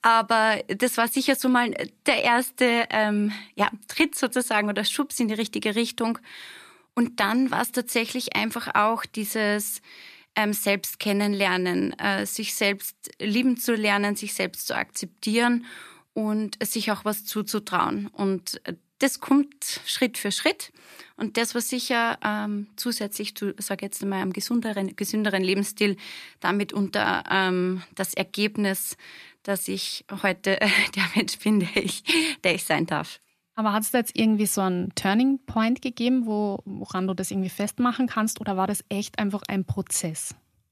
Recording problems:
none

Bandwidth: 14.5 kHz